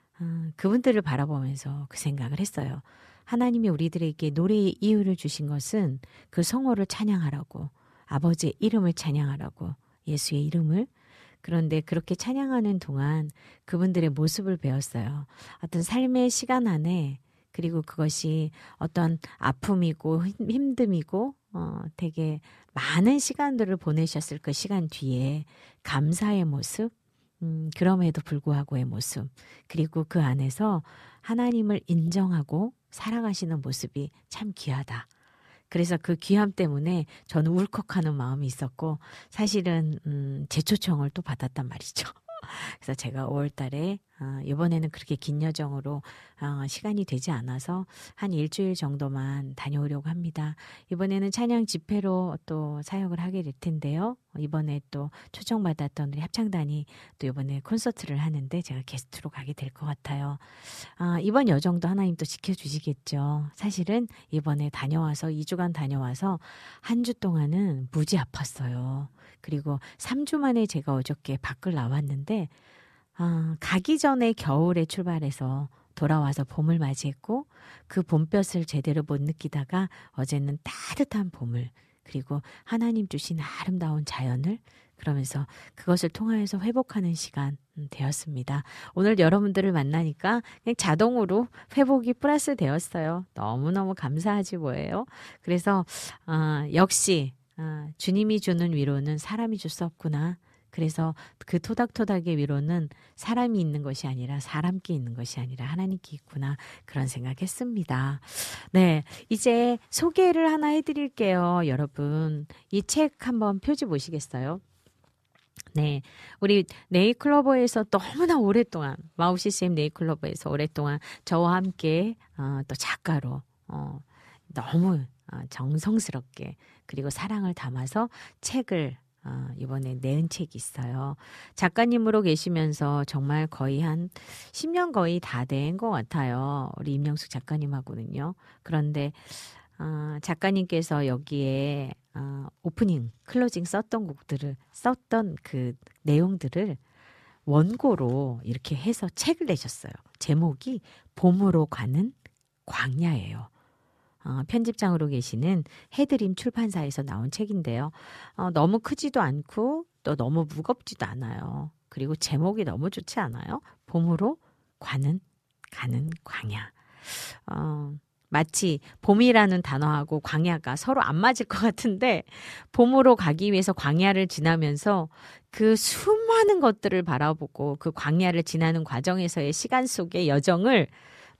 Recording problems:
none

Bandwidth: 14 kHz